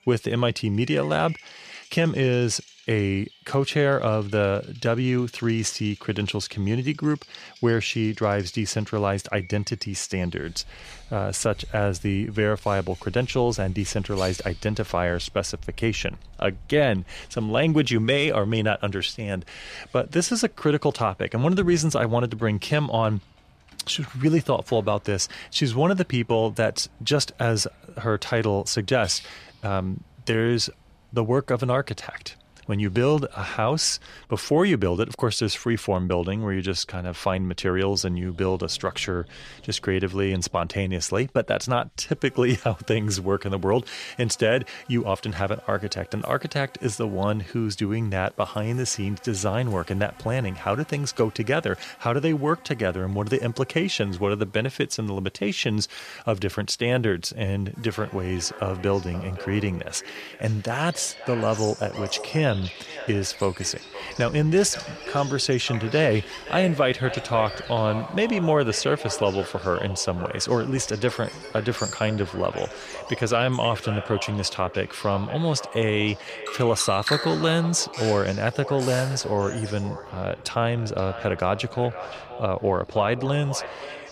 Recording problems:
echo of what is said; noticeable; from 58 s on; 520 ms later, 15 dB below the speech
animal sounds; noticeable; throughout; 15 dB below the speech

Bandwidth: 14.5 kHz